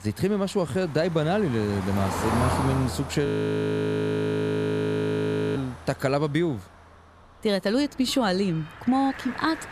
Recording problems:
traffic noise; loud; throughout; 8 dB below the speech
audio freezing; at 3.5 s for 2.5 s

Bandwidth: 14 kHz